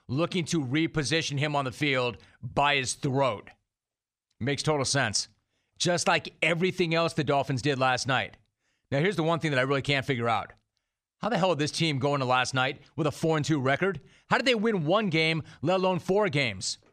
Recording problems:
none

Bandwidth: 14.5 kHz